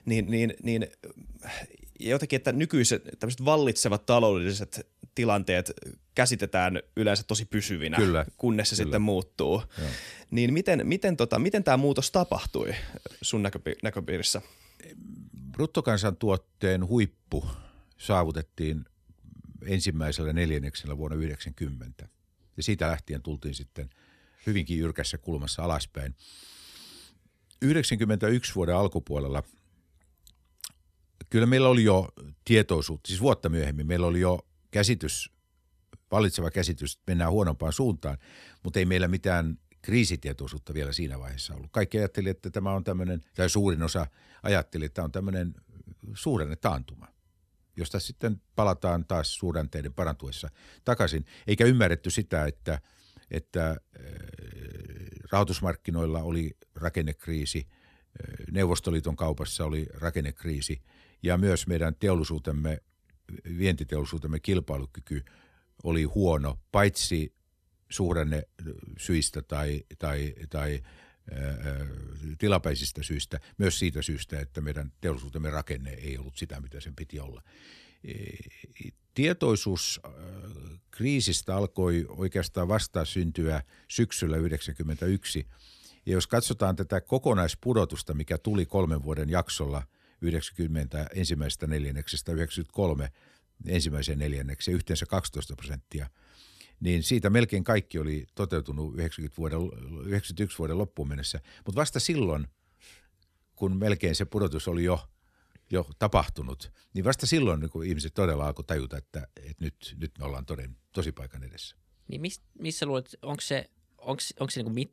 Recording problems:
none

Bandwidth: 14 kHz